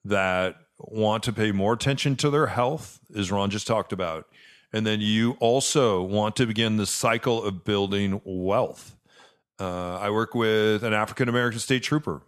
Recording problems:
none

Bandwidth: 13.5 kHz